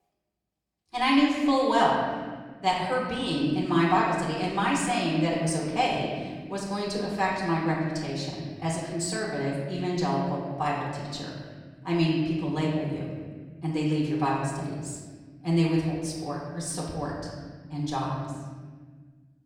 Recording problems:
off-mic speech; far
room echo; noticeable; dies away in 1.6 s

